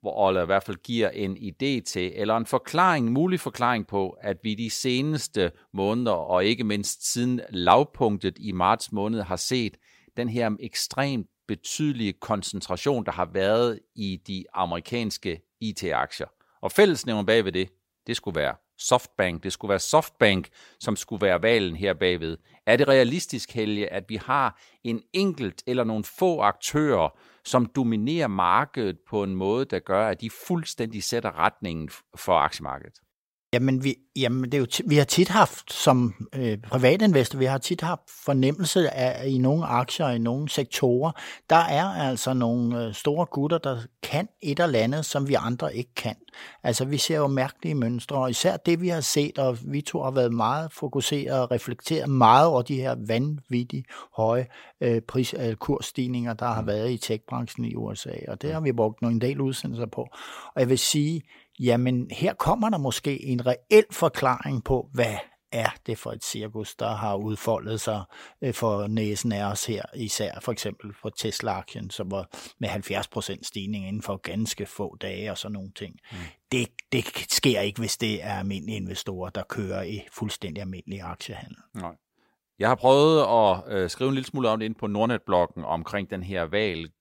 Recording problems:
none

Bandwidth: 16 kHz